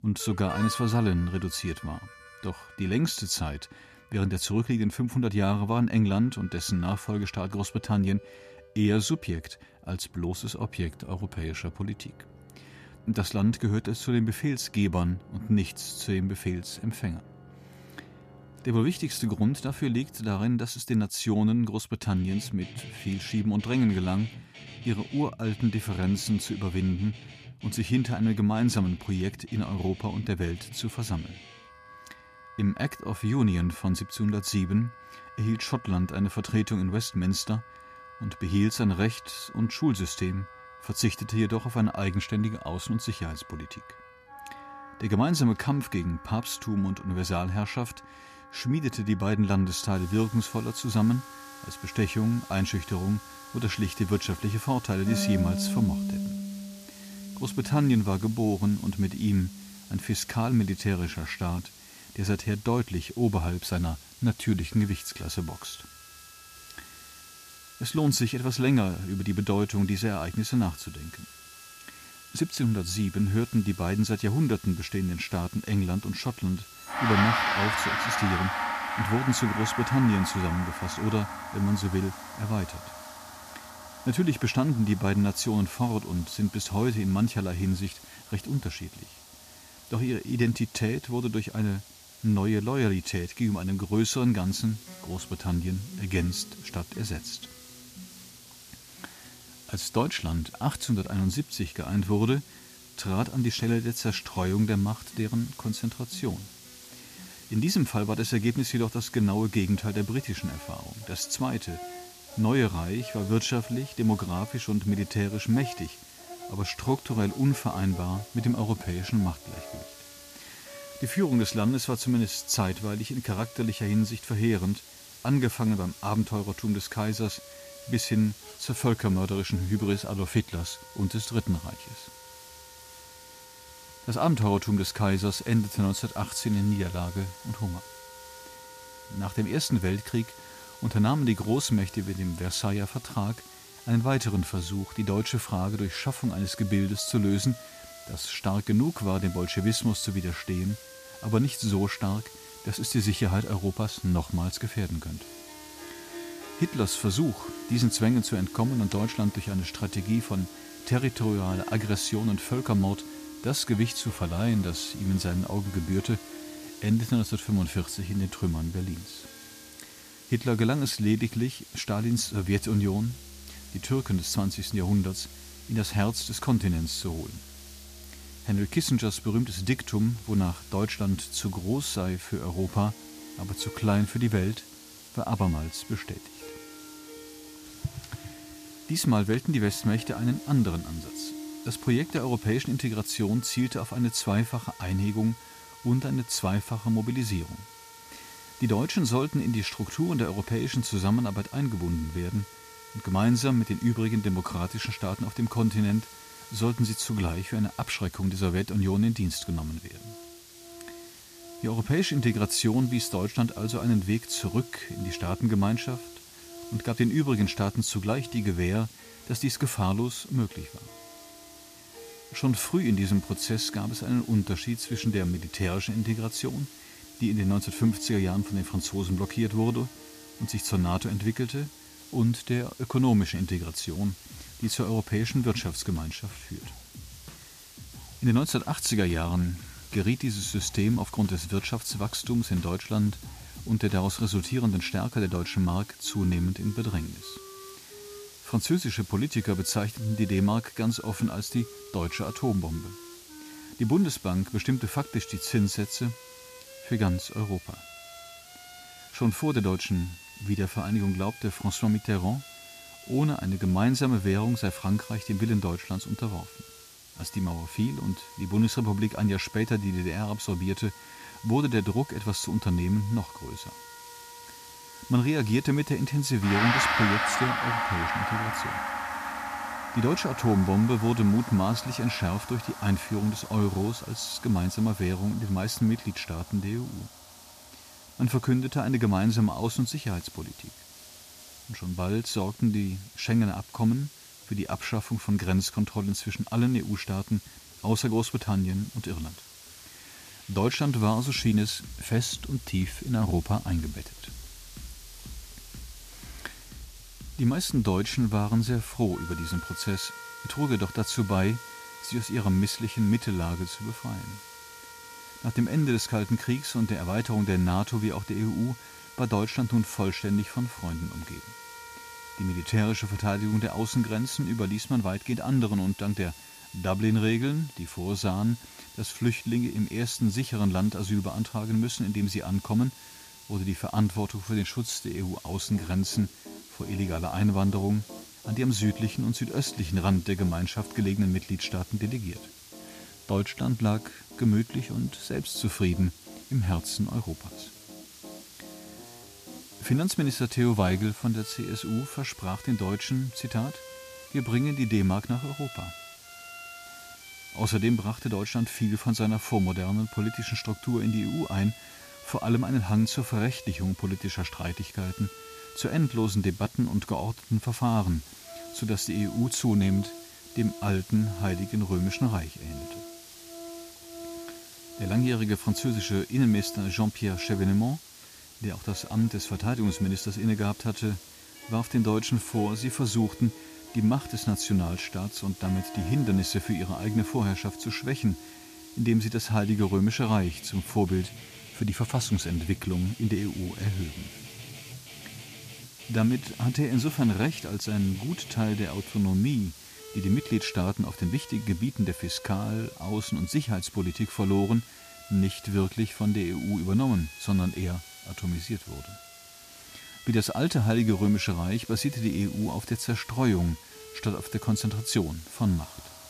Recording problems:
background music; noticeable; throughout; 15 dB below the speech
hiss; noticeable; from 50 s on; 20 dB below the speech

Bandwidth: 14.5 kHz